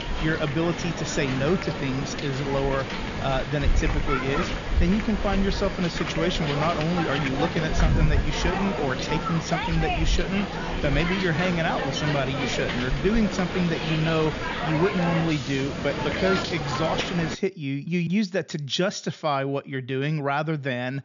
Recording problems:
high frequencies cut off; noticeable; nothing above 7 kHz
hiss; loud; until 17 s; 2 dB below the speech

